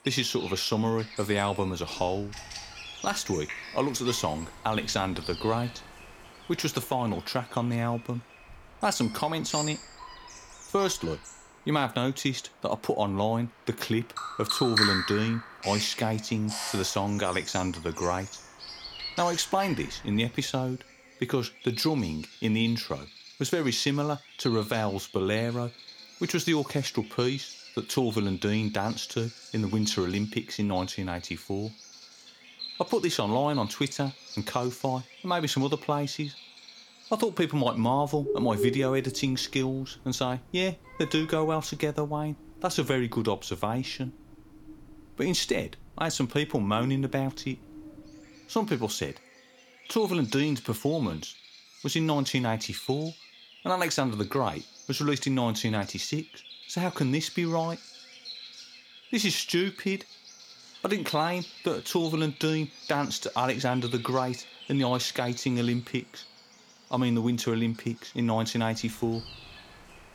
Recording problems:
animal sounds; noticeable; throughout; 10 dB below the speech

